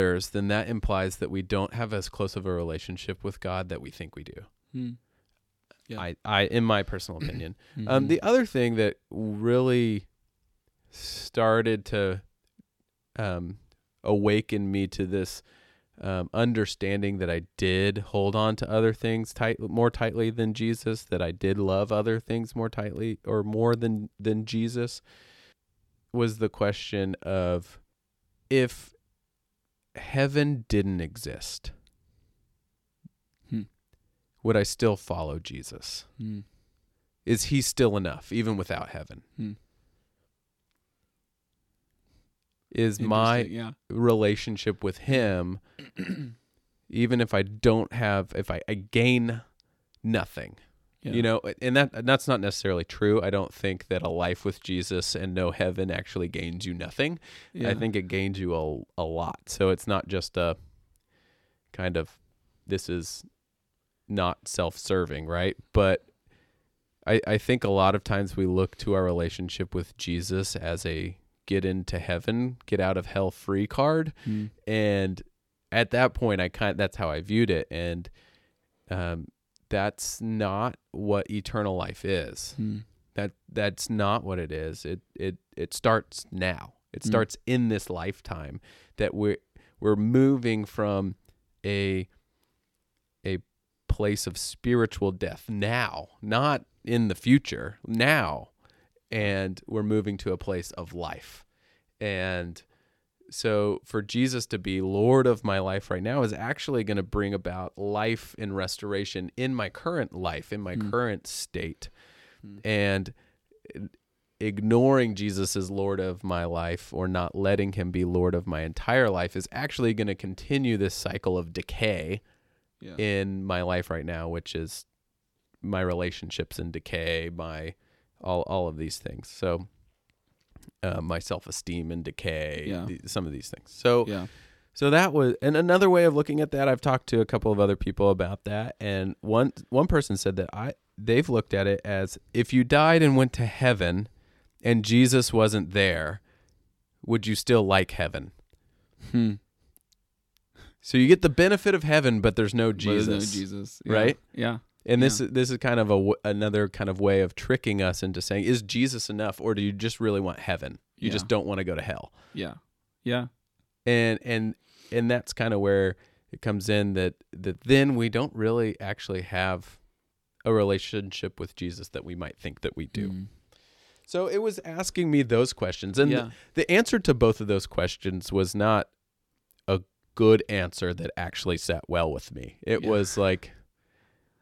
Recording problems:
abrupt cut into speech; at the start

